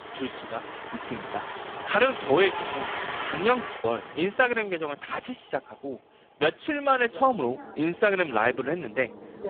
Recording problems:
phone-call audio; poor line
traffic noise; loud; throughout; 10 dB below the speech
choppy; very; at 4 s; 6% of the speech affected

